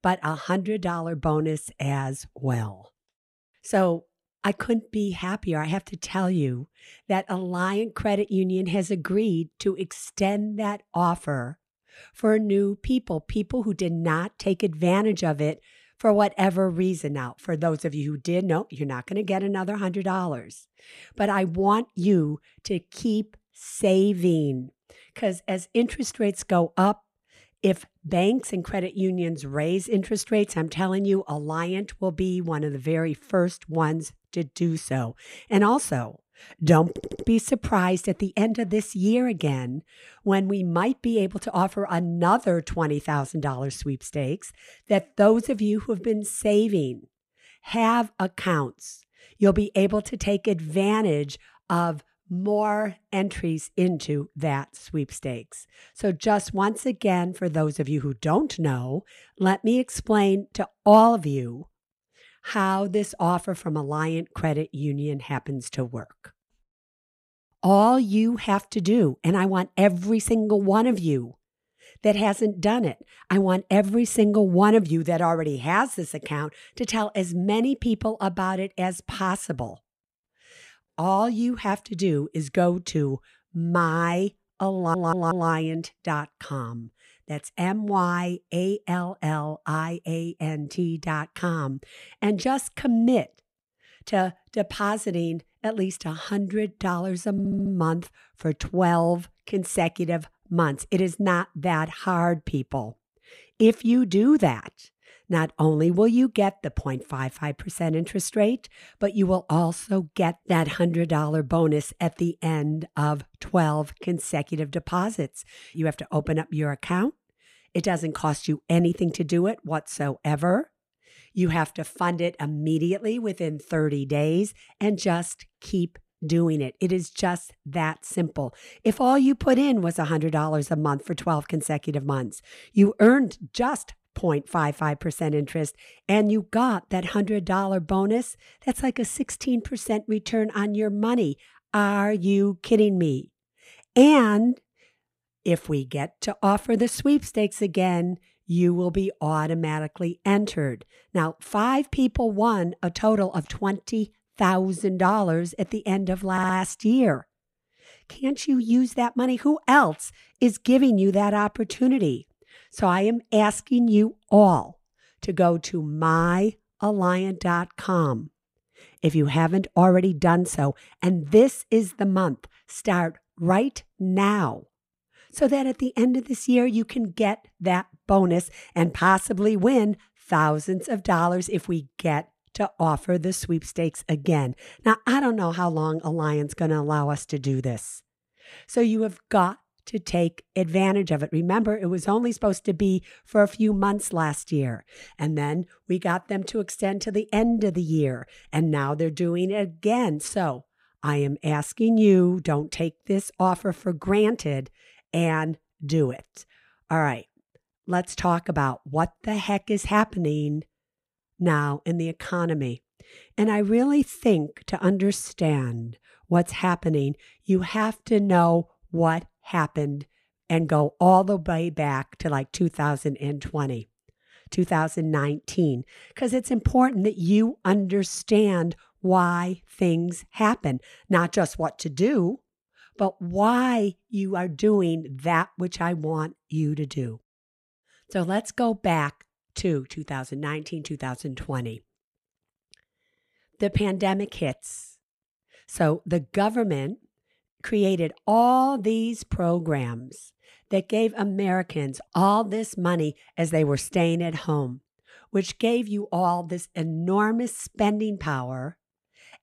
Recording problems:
audio stuttering; 4 times, first at 37 s

